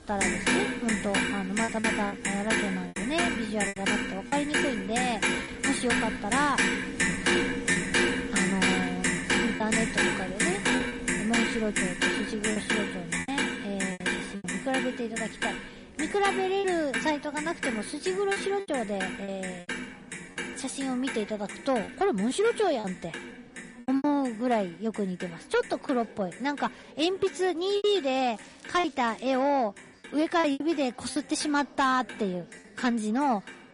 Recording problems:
distortion; slight; 10 dB below the speech
garbled, watery; slightly; nothing above 10.5 kHz
household noises; very loud; throughout; 1 dB above the speech
chatter from many people; faint; throughout; 20 dB below the speech
crackling; faint; from 28 to 29 s; 25 dB below the speech
choppy; very; 6% of the speech affected

